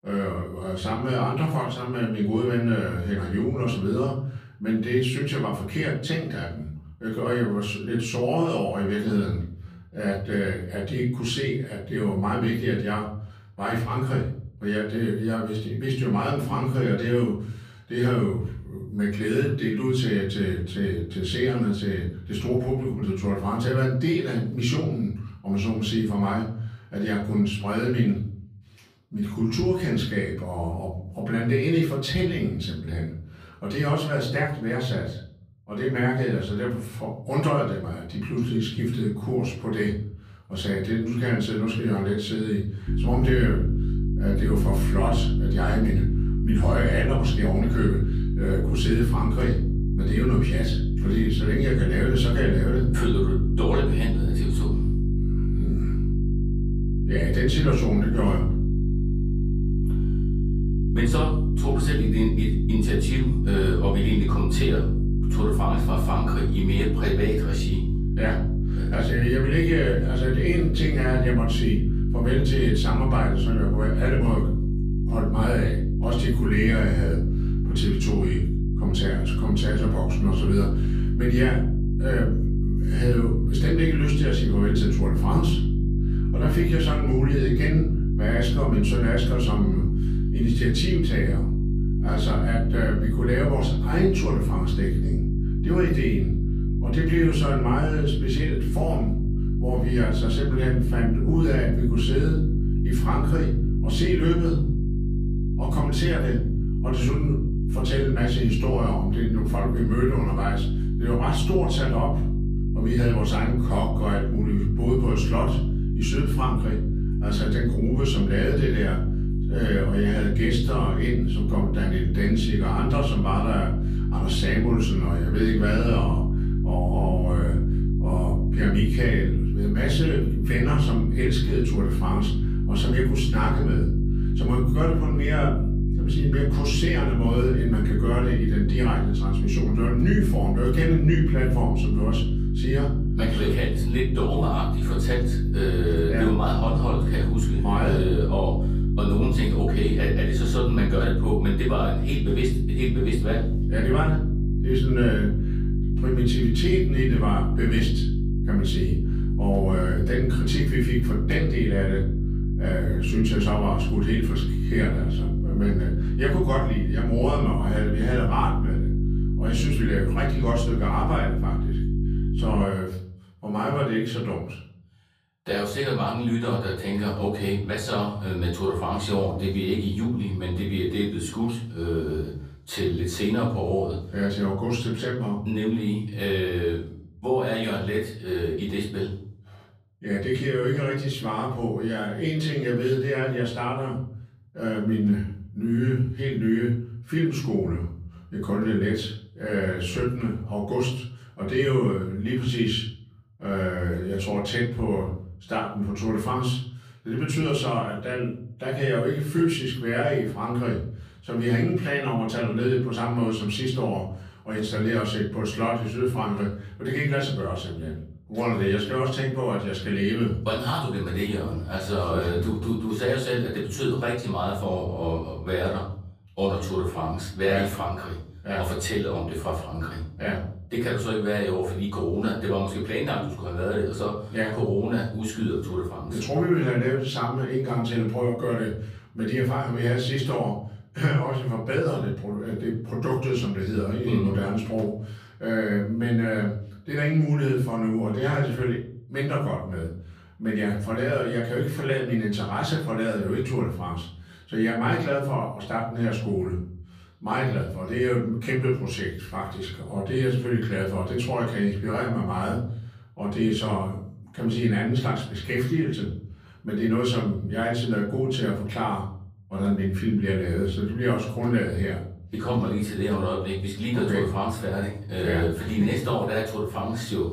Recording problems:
off-mic speech; far
room echo; noticeable; dies away in 0.7 s
electrical hum; loud; from 43 s to 2:53; 50 Hz, 7 dB below the speech

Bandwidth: 15 kHz